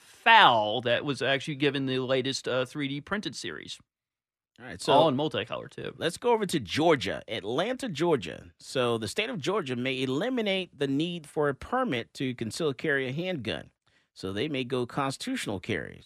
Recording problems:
none

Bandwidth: 14 kHz